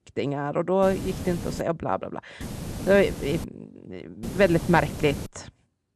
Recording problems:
hiss; noticeable; at 1 s, from 2.5 to 3.5 s and from 4 to 5.5 s; 10 dB below the speech

